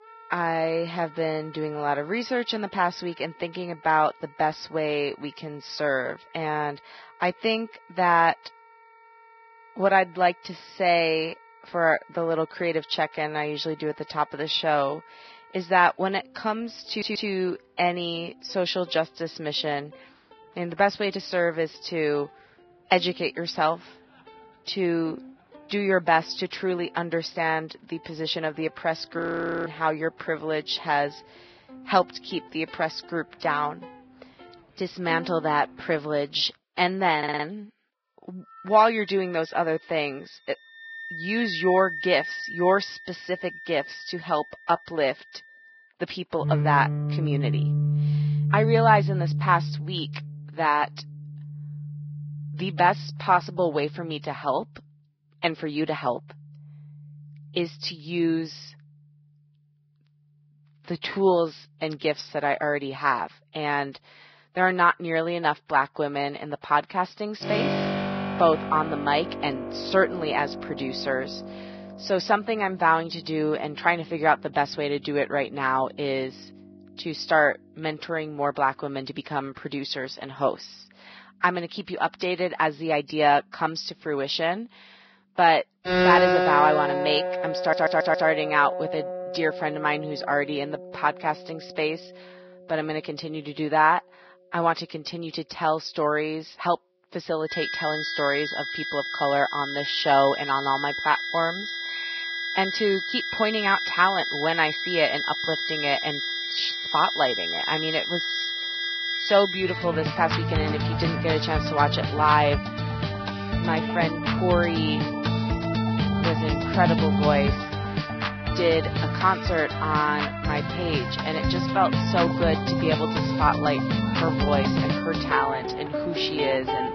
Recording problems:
garbled, watery; badly; nothing above 5.5 kHz
background music; loud; throughout; 2 dB below the speech
audio stuttering; at 17 s, at 37 s and at 1:28
audio freezing; at 29 s

